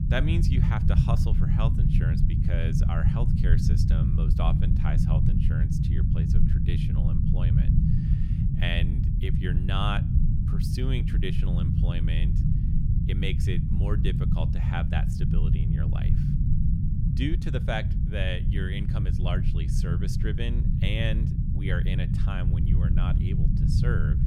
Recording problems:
low rumble; loud; throughout; 1 dB below the speech

